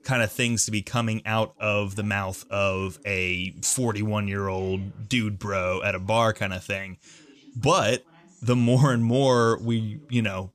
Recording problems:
voice in the background; faint; throughout; 30 dB below the speech

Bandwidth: 14.5 kHz